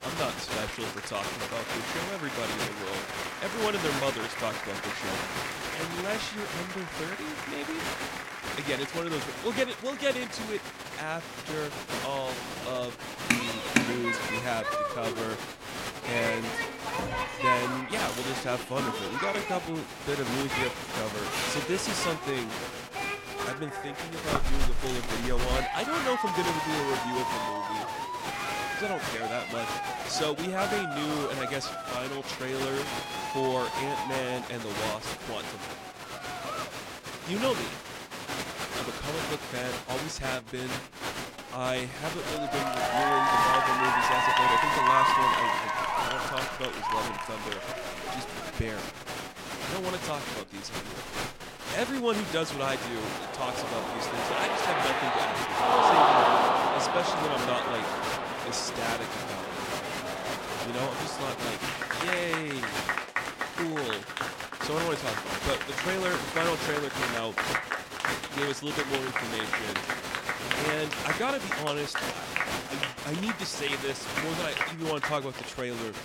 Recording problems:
crowd noise; very loud; throughout; 4 dB above the speech
murmuring crowd; faint; throughout; 25 dB below the speech

